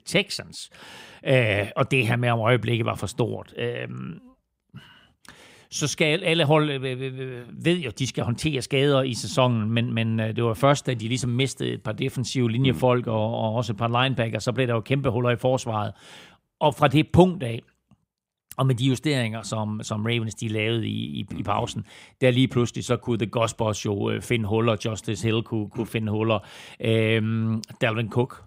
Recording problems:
none

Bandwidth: 15.5 kHz